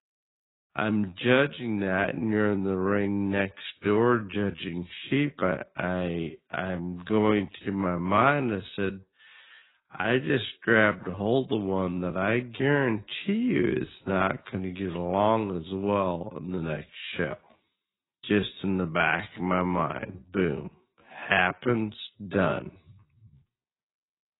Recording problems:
garbled, watery; badly; nothing above 4 kHz
wrong speed, natural pitch; too slow; 0.5 times normal speed

